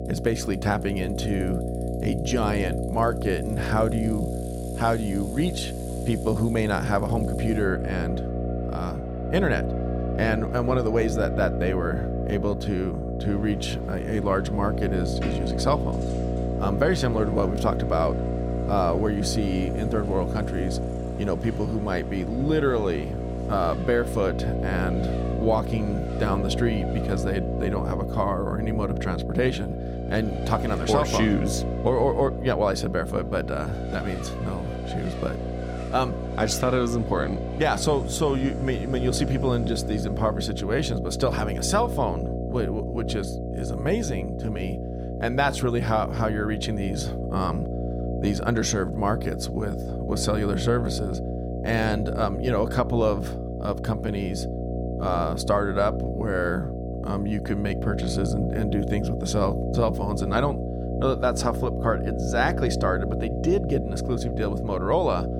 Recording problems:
electrical hum; loud; throughout; 60 Hz, 6 dB below the speech
traffic noise; noticeable; until 40 s; 15 dB below the speech

